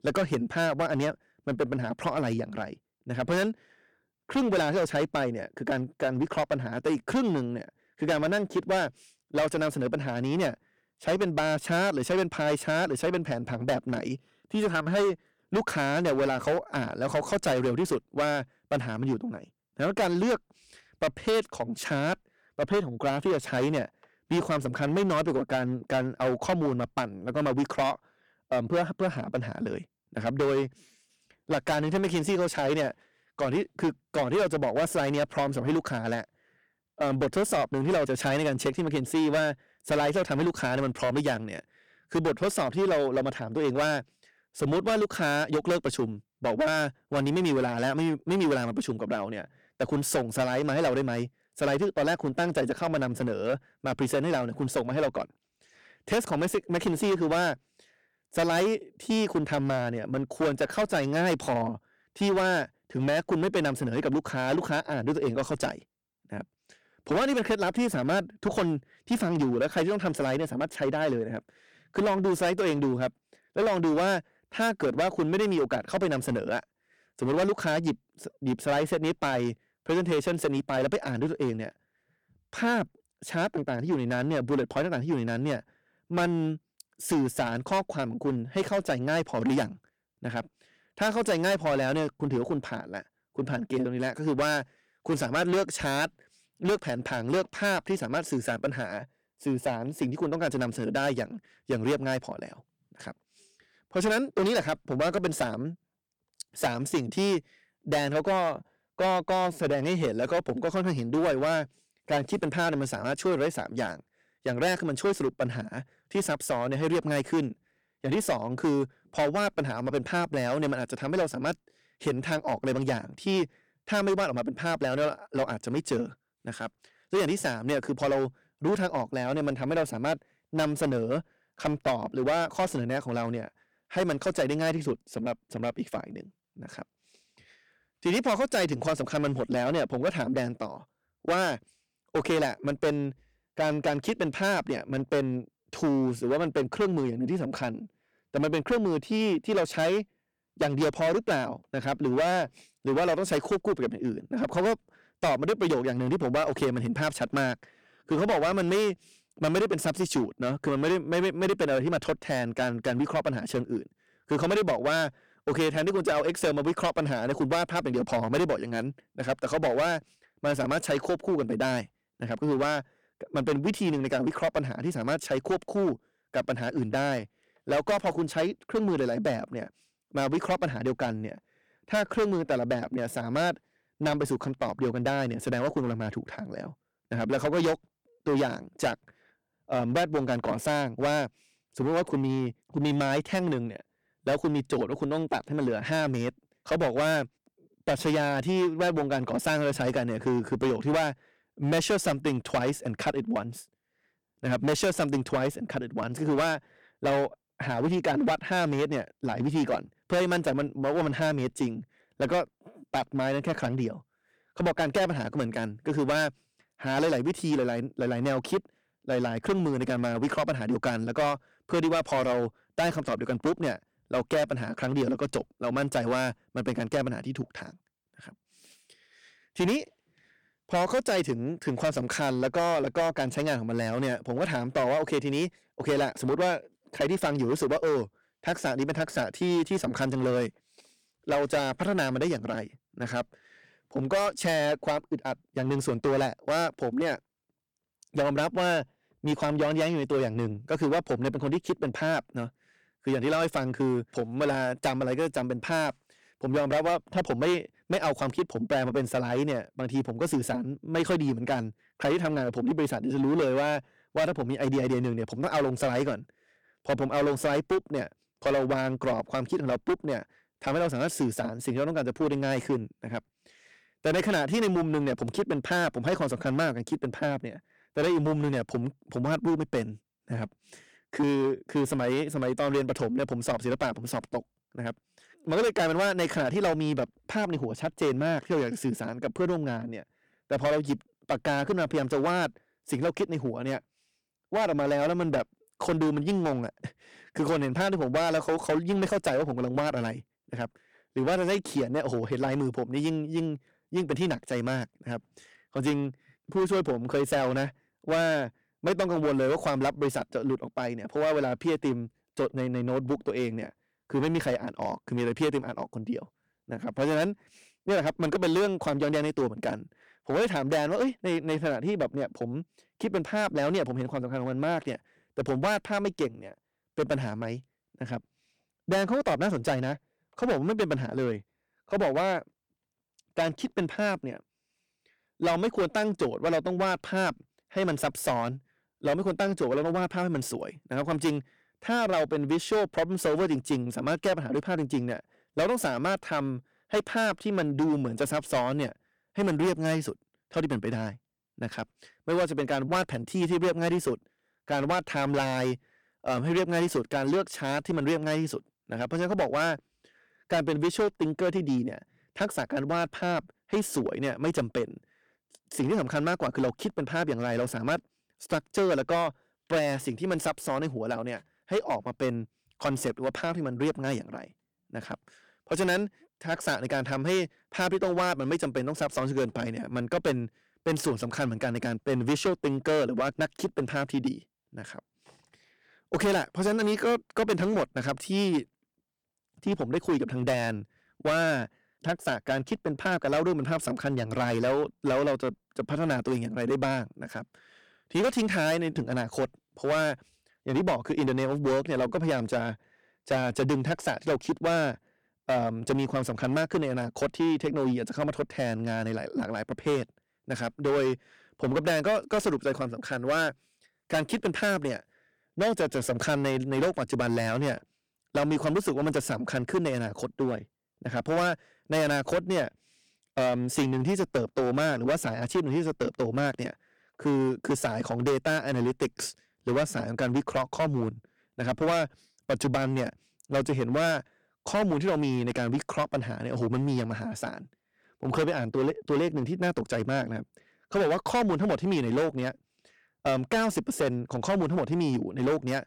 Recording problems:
distortion; heavy; 10% of the sound clipped

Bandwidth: 18.5 kHz